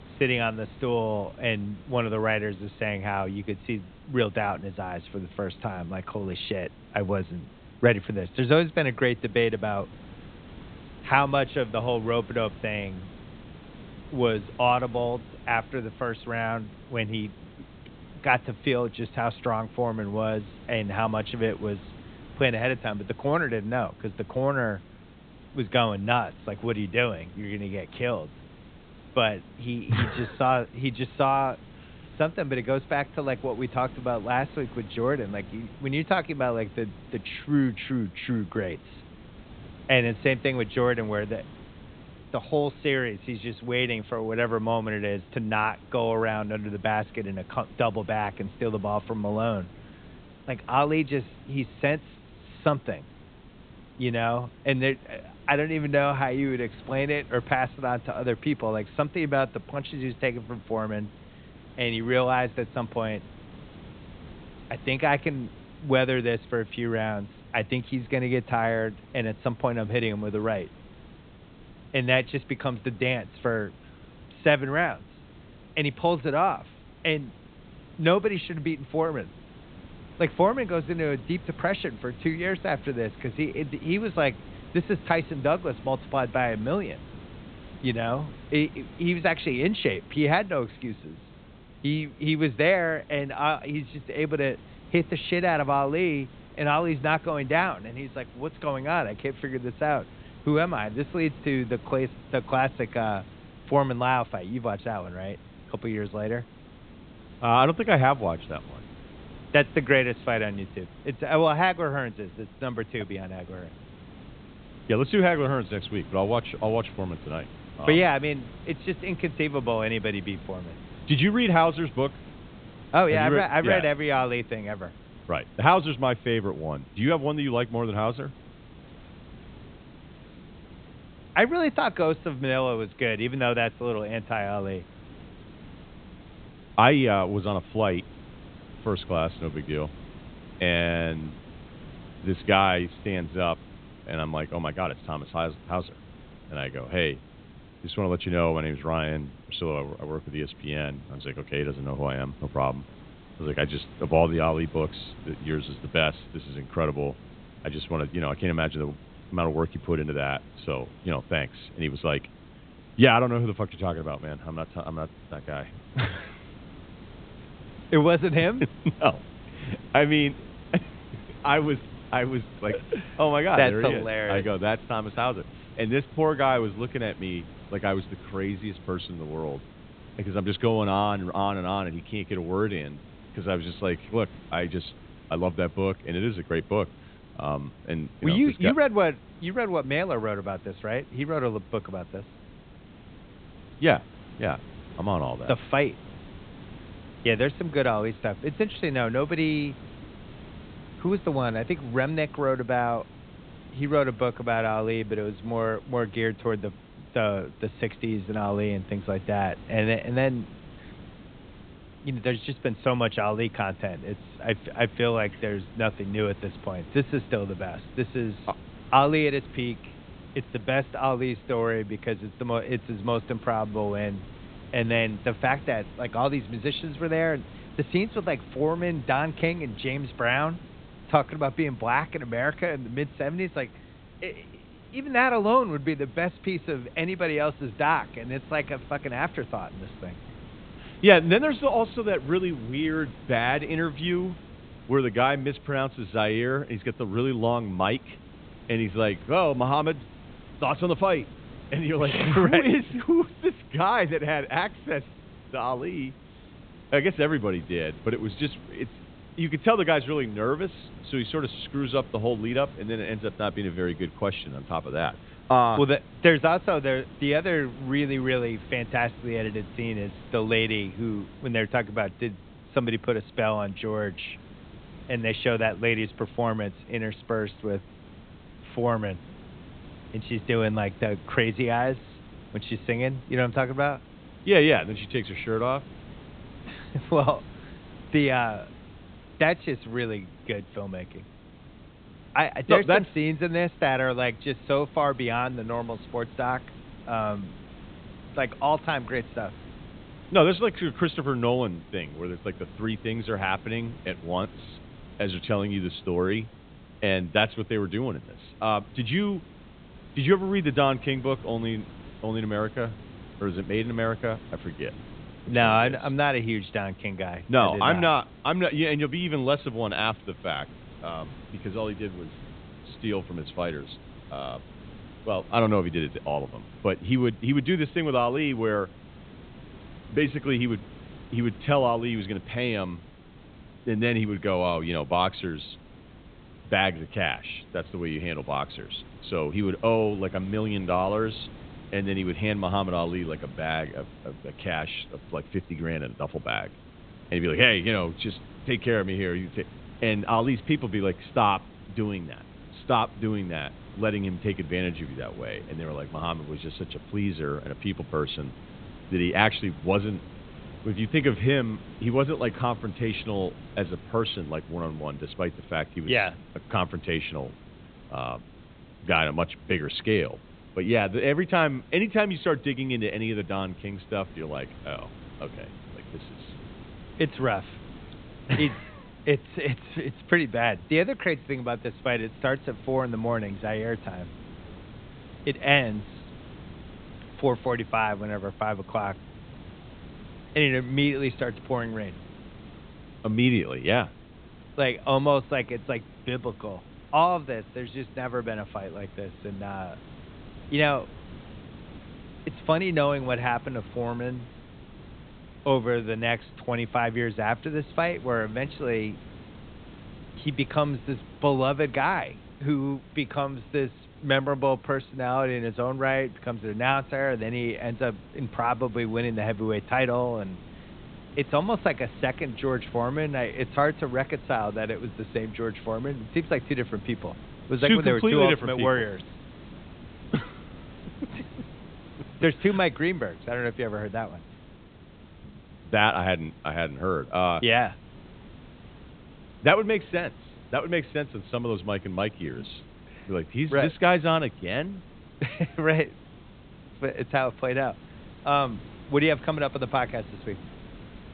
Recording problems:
high frequencies cut off; severe; nothing above 4 kHz
hiss; noticeable; throughout; 20 dB below the speech

